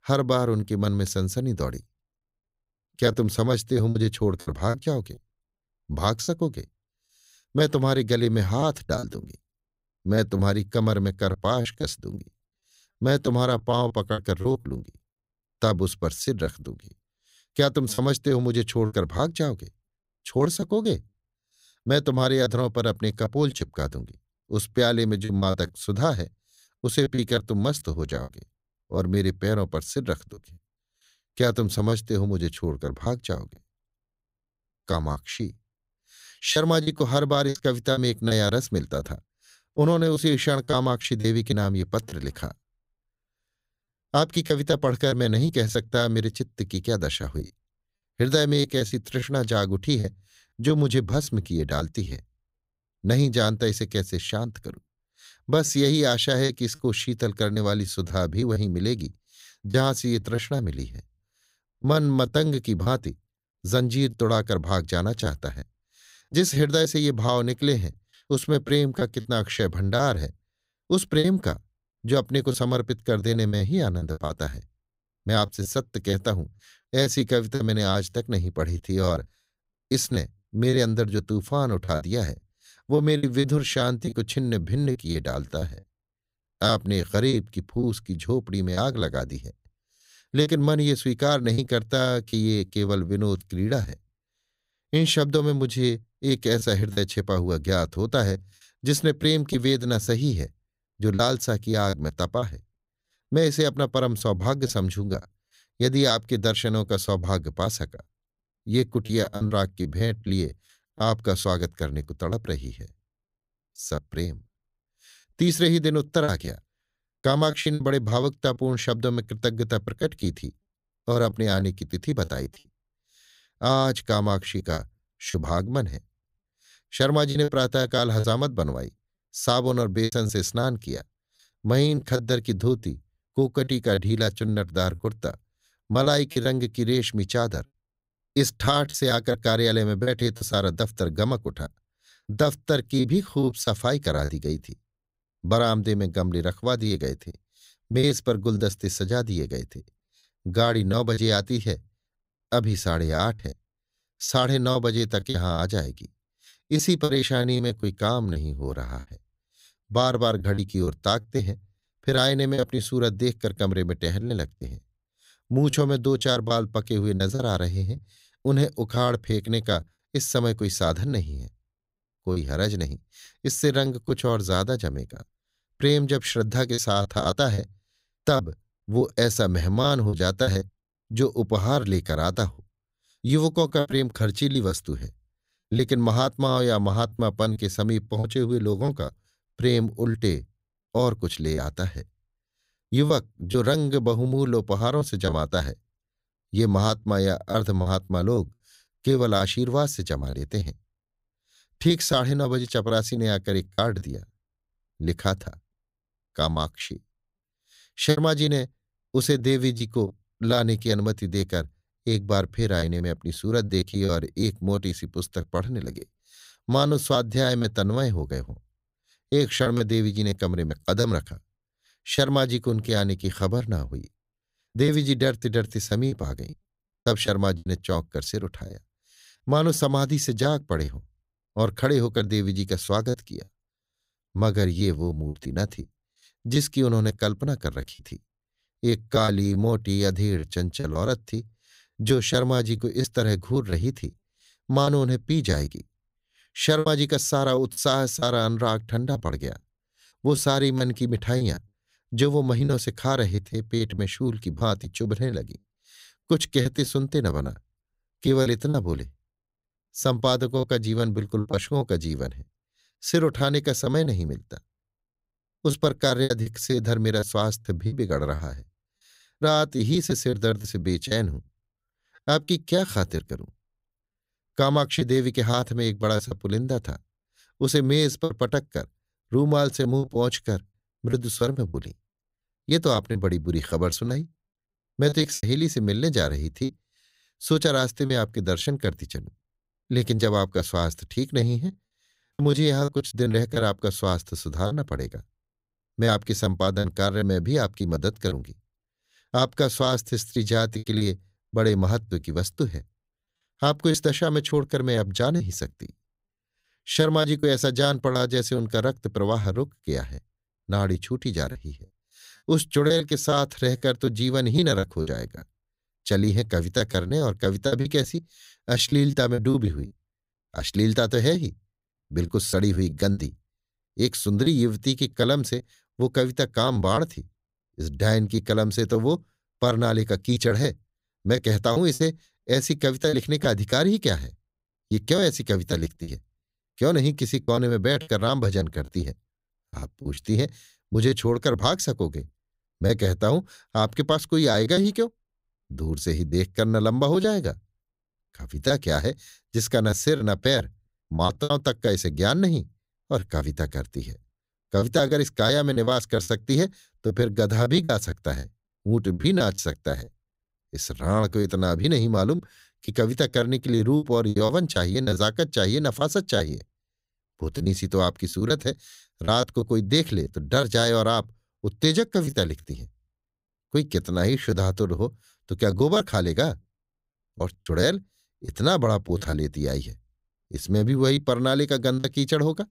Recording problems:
choppy; very; 8% of the speech affected

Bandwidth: 15.5 kHz